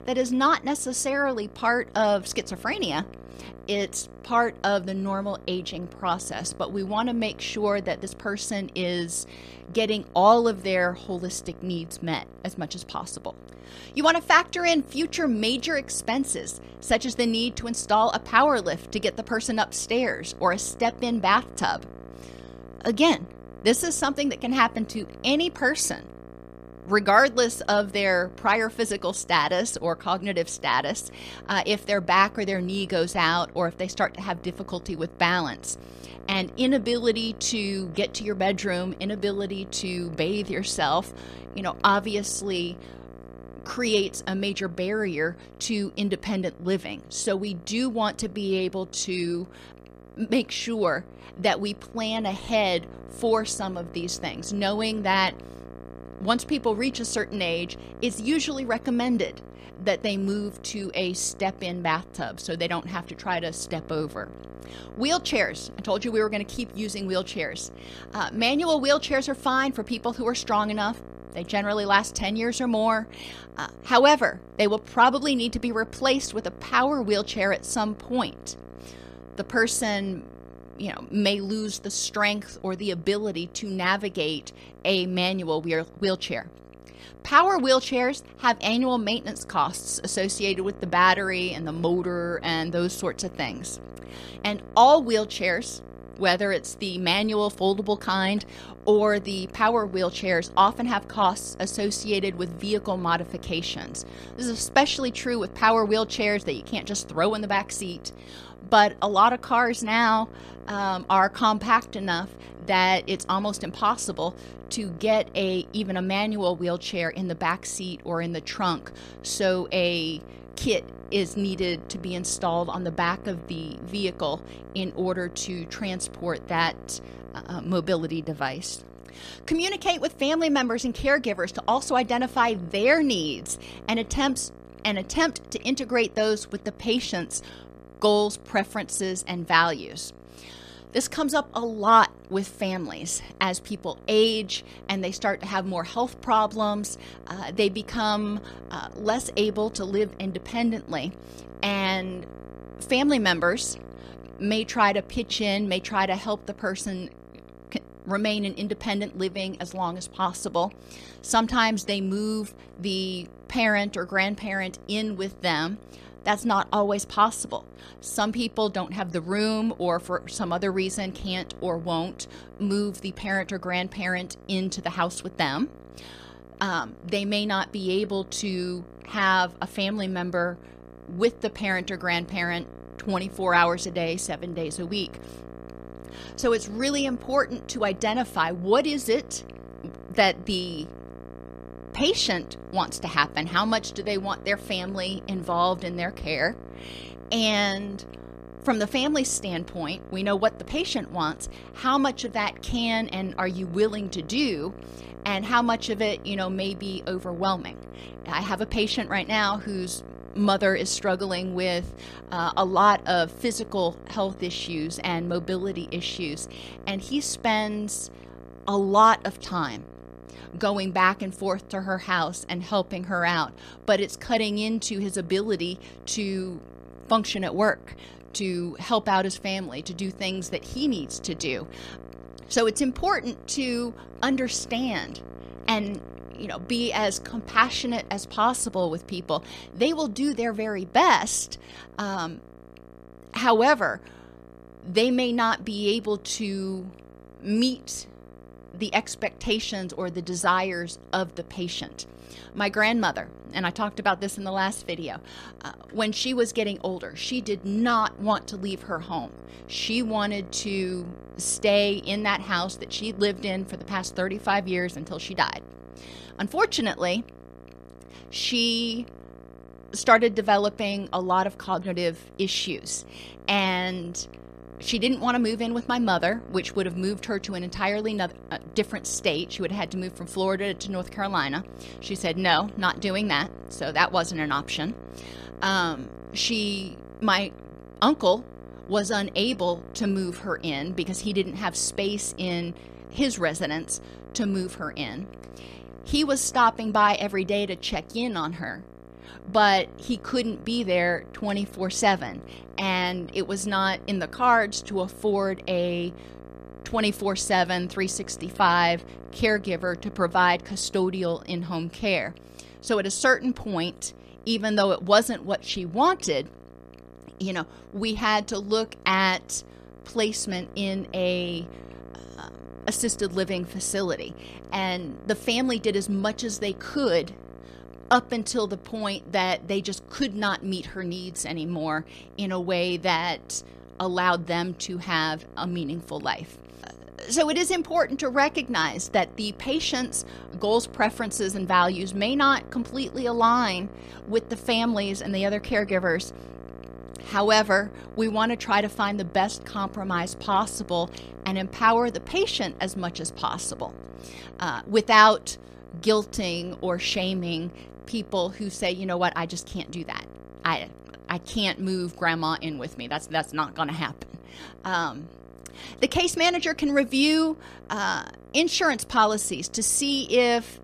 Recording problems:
electrical hum; faint; throughout; 60 Hz, 25 dB below the speech

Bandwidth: 14.5 kHz